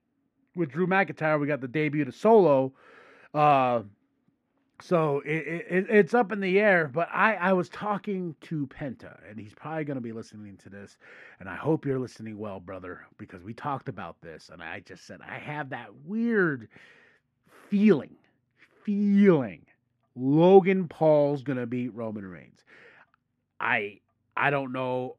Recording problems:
muffled; very; fading above 3.5 kHz

